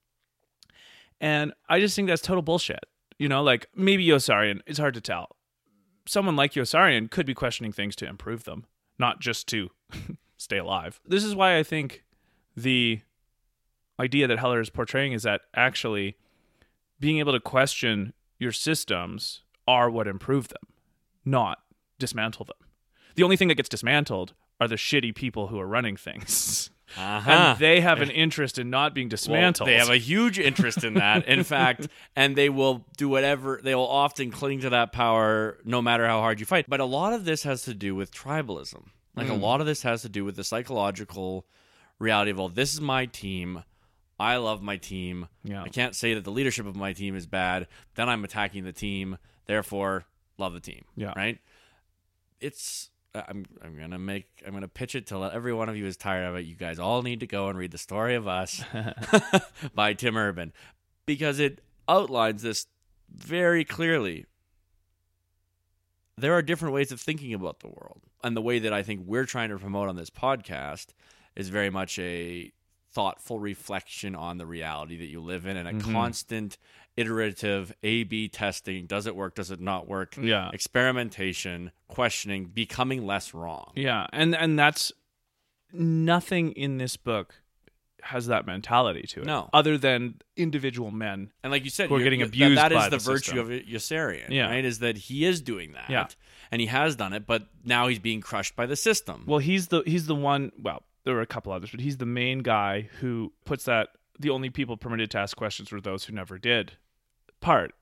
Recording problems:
uneven, jittery; strongly; from 14 s to 1:24

